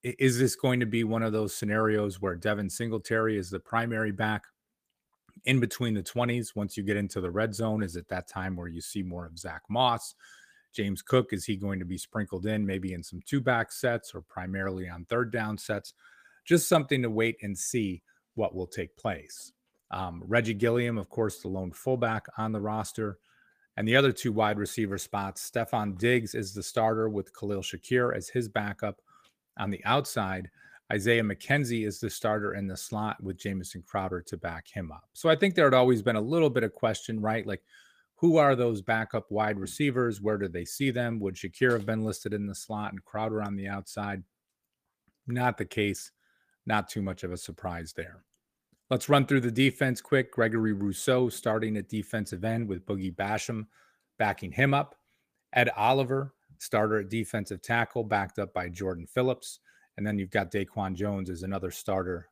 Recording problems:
garbled, watery; slightly; nothing above 15 kHz

